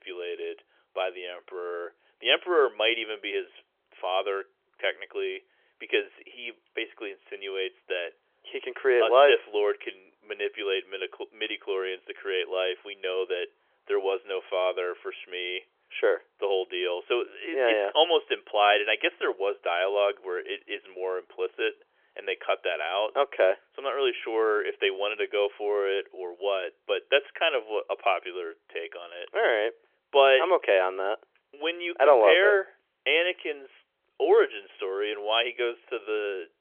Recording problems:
phone-call audio; nothing above 3.5 kHz

